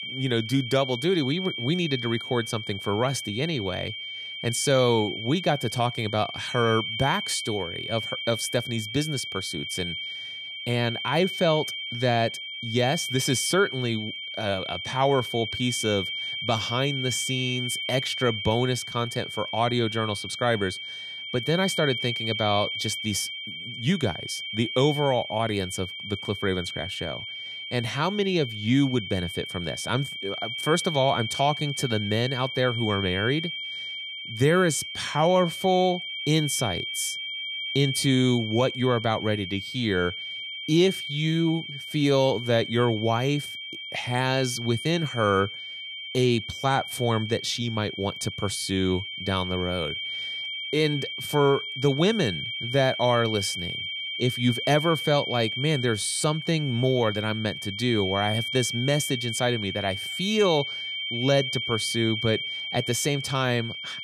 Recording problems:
high-pitched whine; loud; throughout; 3 kHz, 5 dB below the speech

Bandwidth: 14.5 kHz